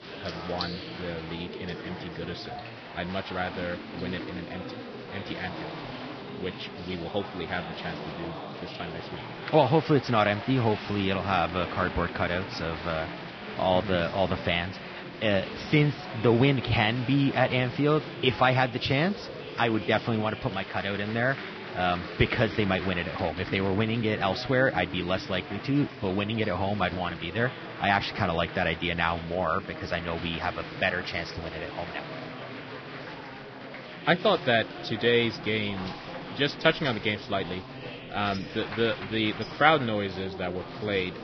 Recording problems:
garbled, watery; badly; nothing above 5.5 kHz
murmuring crowd; noticeable; throughout; 10 dB below the speech
household noises; faint; throughout; 25 dB below the speech

